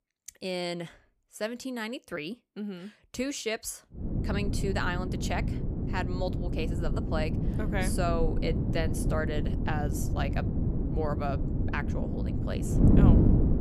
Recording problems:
wind noise on the microphone; heavy; from 4 s on; 2 dB below the speech

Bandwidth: 15 kHz